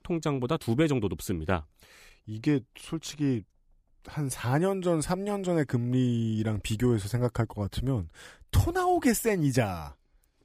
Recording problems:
none

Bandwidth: 15 kHz